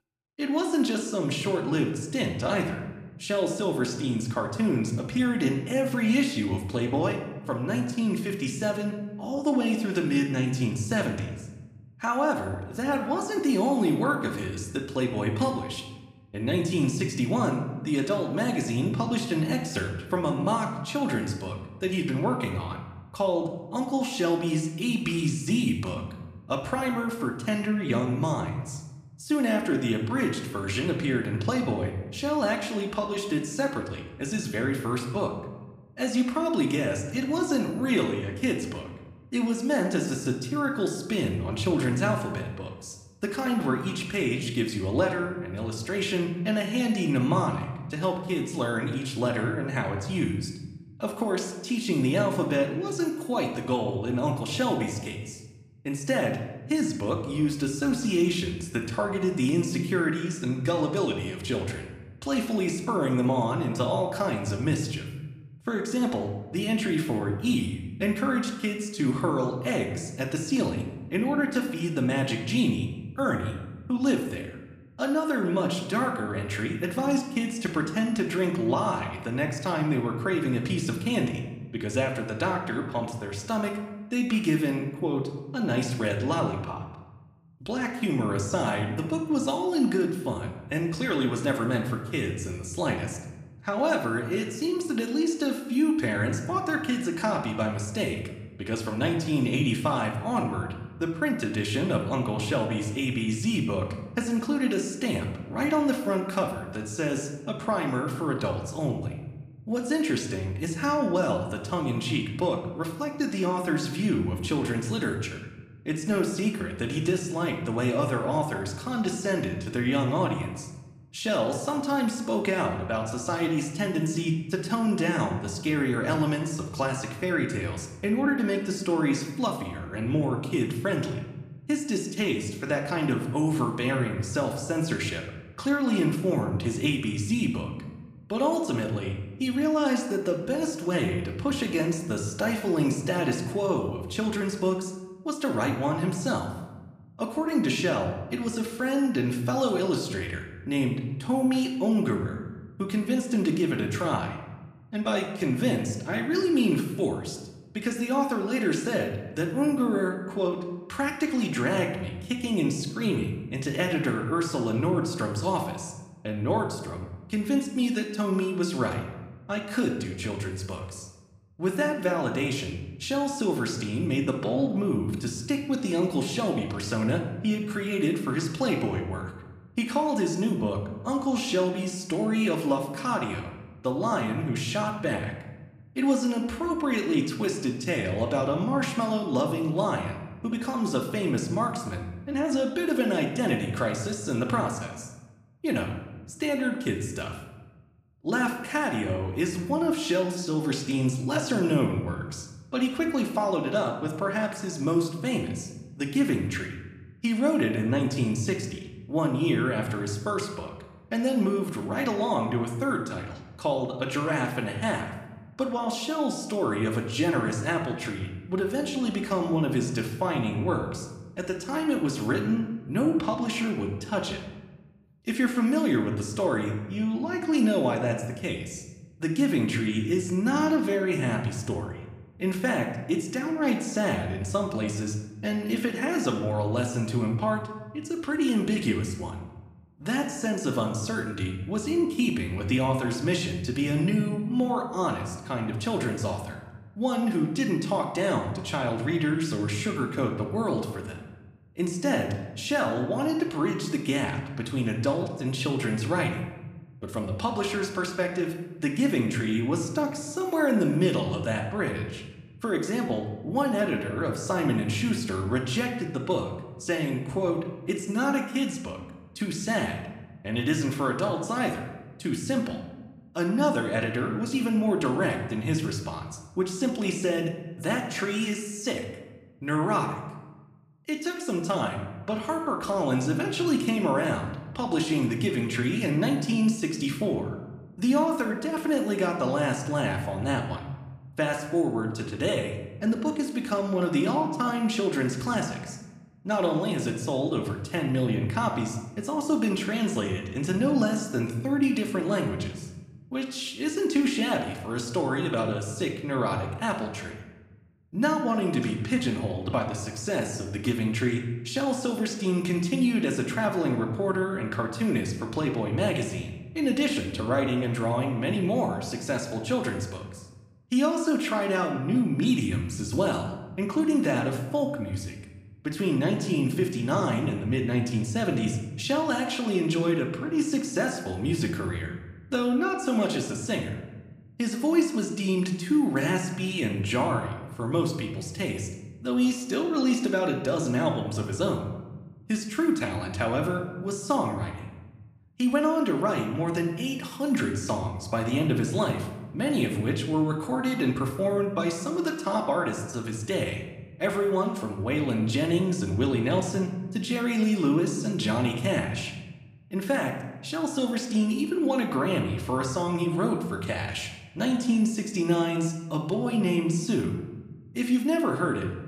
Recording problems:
room echo; slight; dies away in 0.9 s
off-mic speech; somewhat distant

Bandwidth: 14.5 kHz